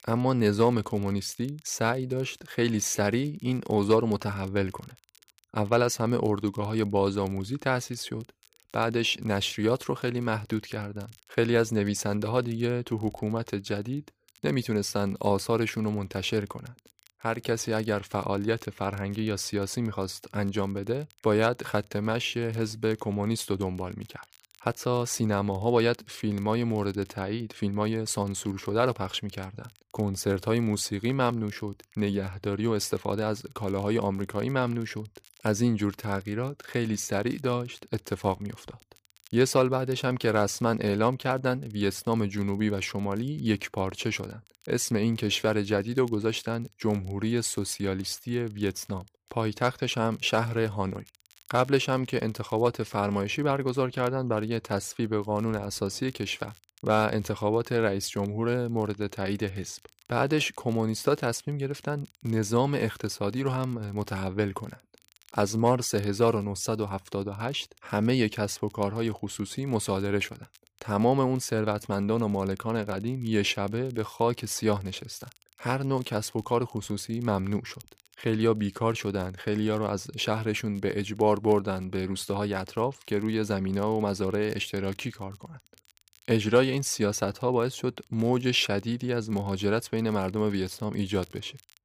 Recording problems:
crackle, like an old record; faint; 30 dB below the speech

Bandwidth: 15 kHz